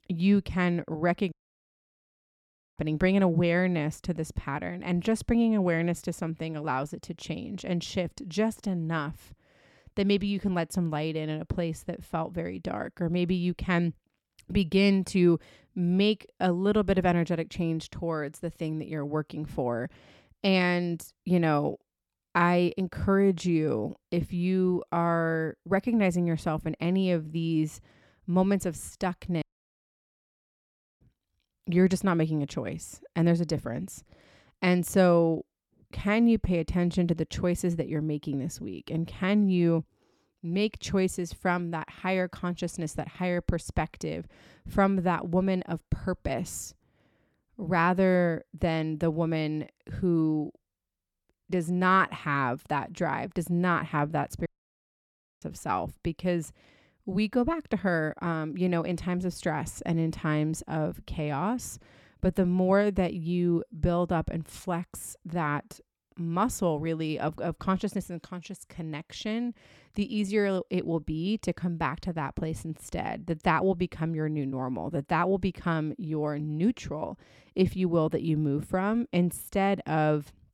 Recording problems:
audio cutting out; at 1.5 s for 1.5 s, at 29 s for 1.5 s and at 54 s for 1 s

